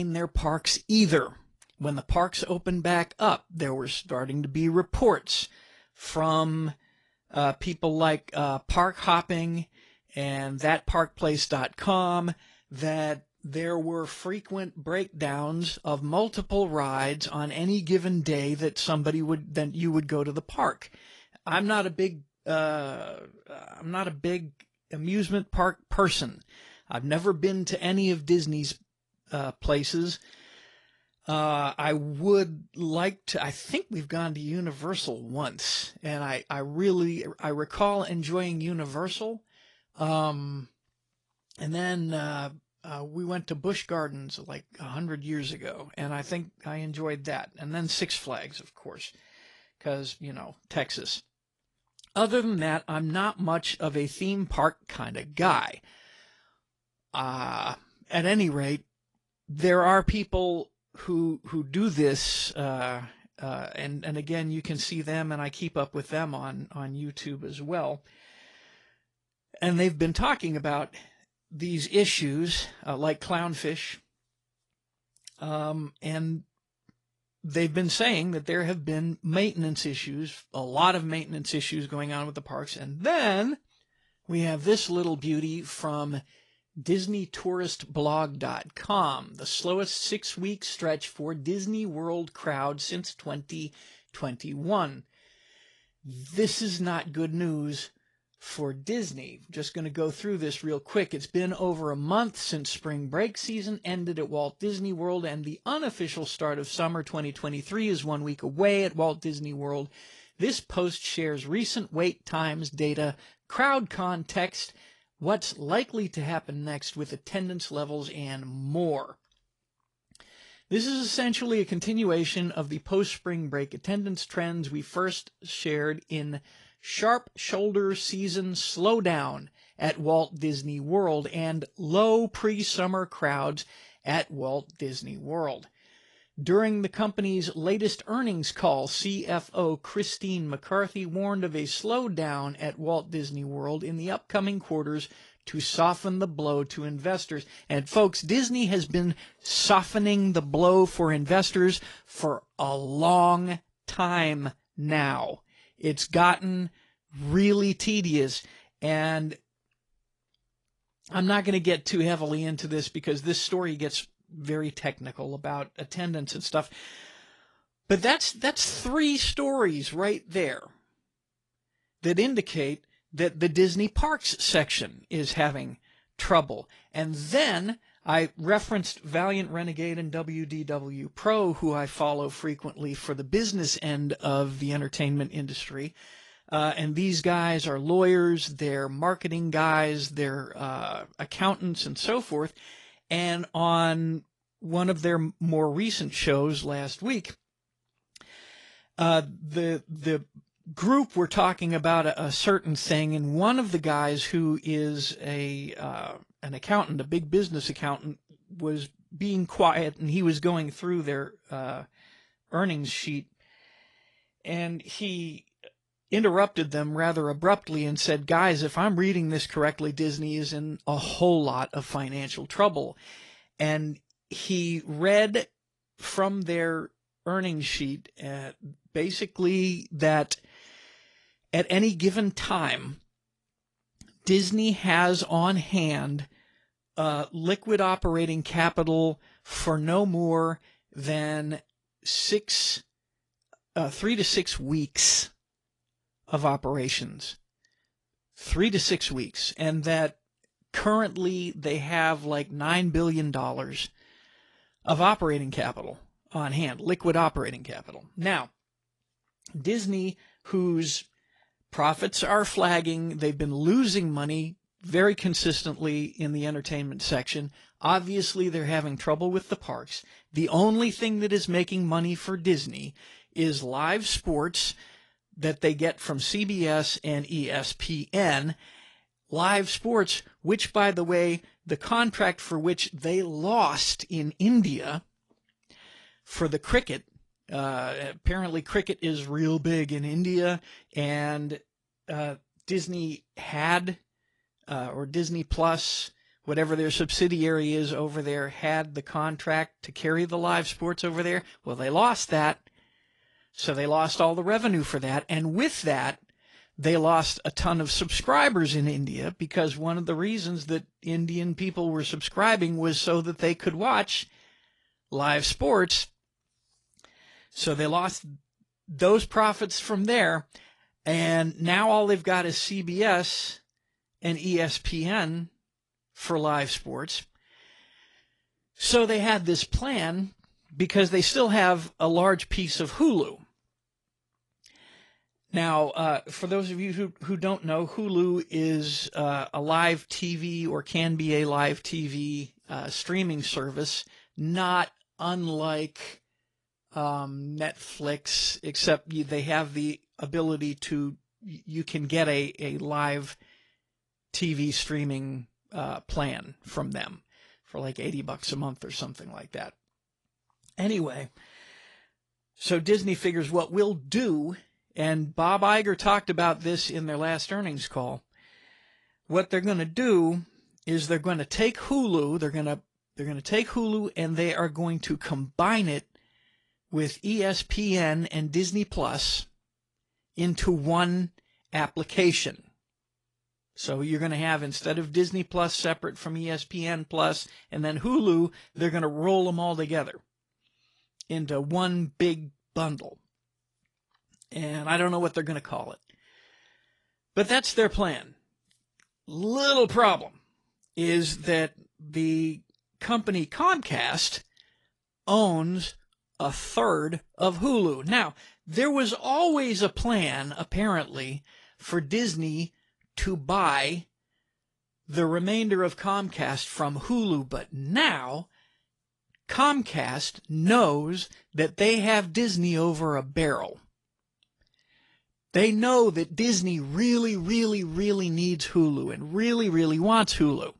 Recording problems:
garbled, watery; slightly; nothing above 10.5 kHz
abrupt cut into speech; at the start

